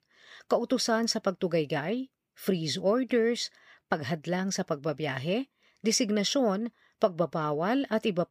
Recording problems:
none

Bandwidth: 15 kHz